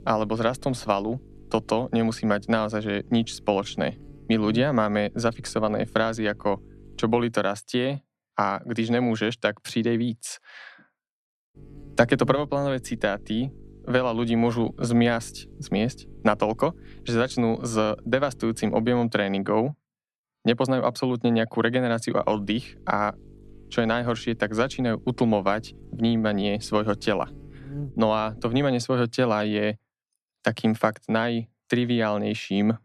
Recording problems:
electrical hum; faint; until 7.5 s, from 12 to 19 s and from 22 to 29 s; 50 Hz, 25 dB below the speech

